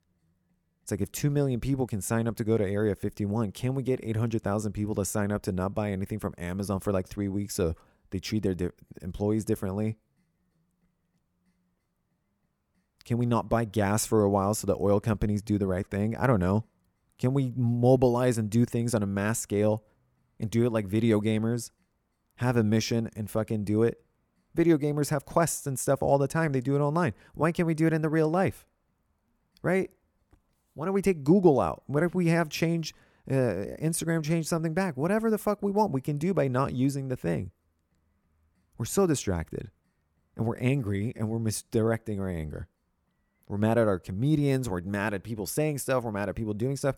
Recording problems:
none

